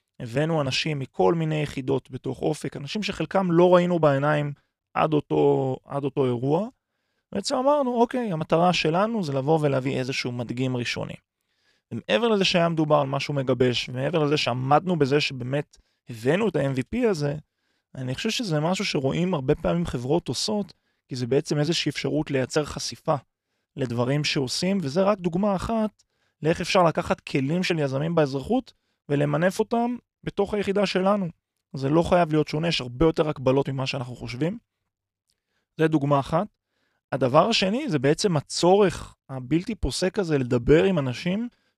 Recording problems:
none

